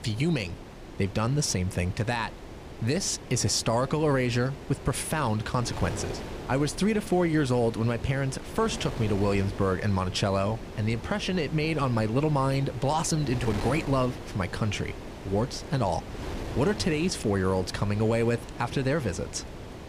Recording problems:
wind noise on the microphone; occasional gusts; 10 dB below the speech

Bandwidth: 15 kHz